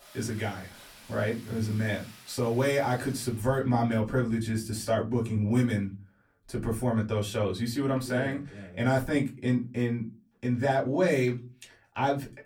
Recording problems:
off-mic speech; far
room echo; very slight; dies away in 0.2 s
rain or running water; faint; until 4.5 s; 20 dB below the speech

